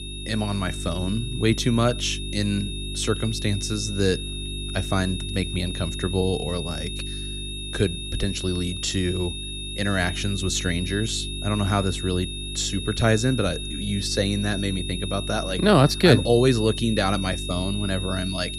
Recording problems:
high-pitched whine; loud; throughout; 3.5 kHz, 8 dB below the speech
electrical hum; noticeable; throughout; 50 Hz, 20 dB below the speech

